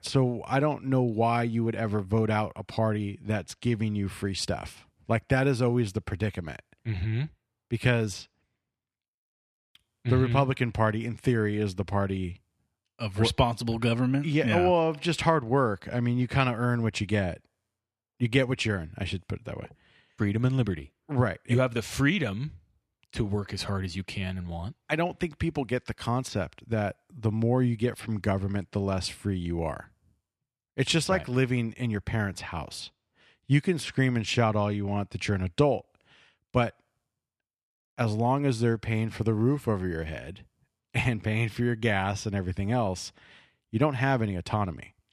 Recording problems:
none

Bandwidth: 14.5 kHz